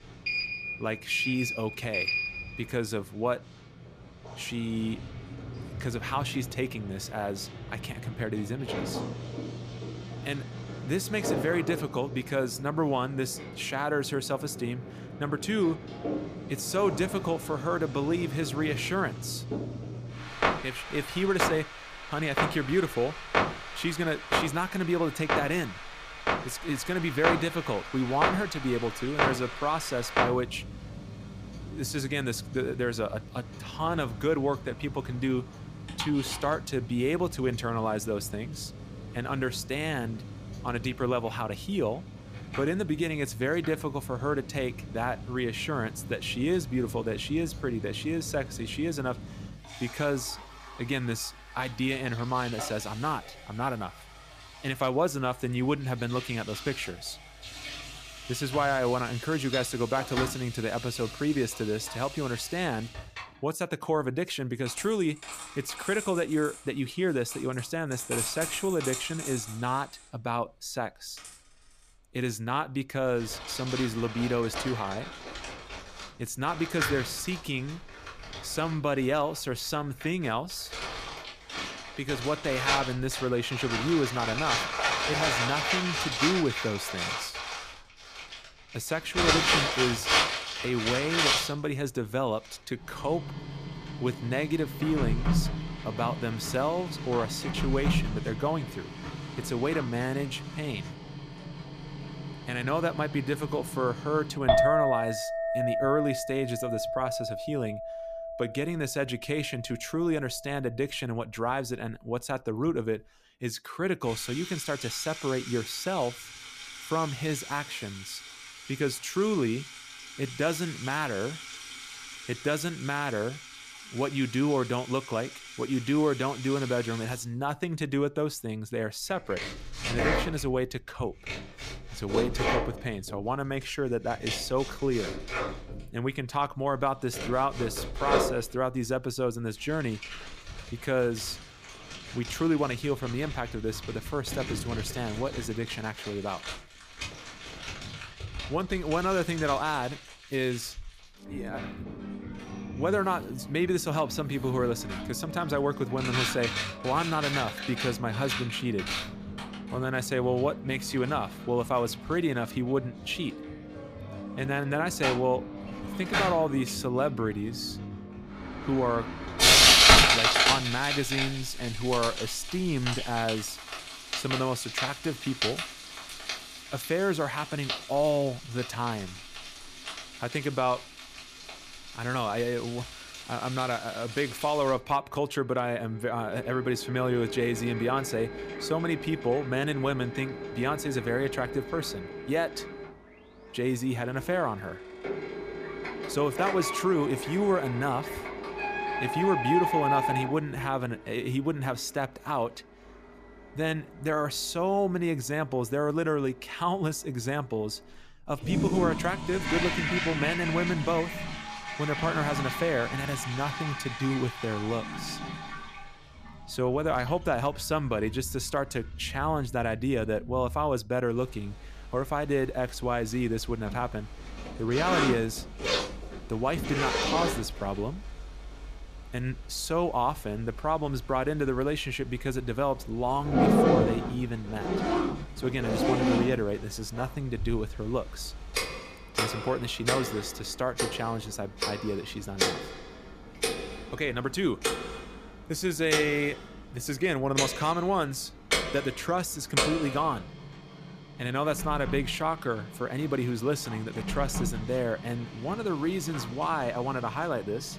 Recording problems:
household noises; loud; throughout; 2 dB below the speech

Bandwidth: 14.5 kHz